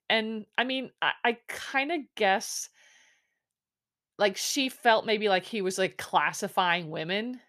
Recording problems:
none

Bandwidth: 14.5 kHz